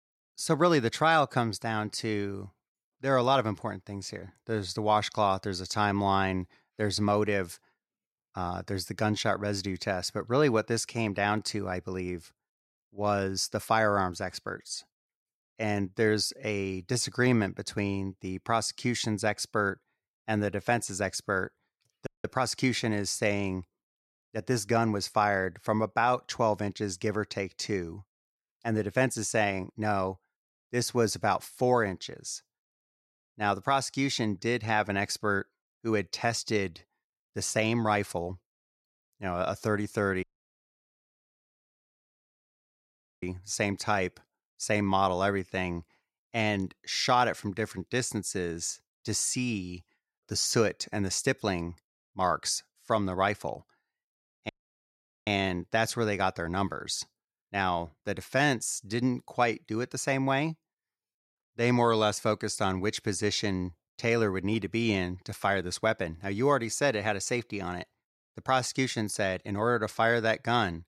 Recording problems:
audio cutting out; at 22 s, at 40 s for 3 s and at 54 s for 1 s

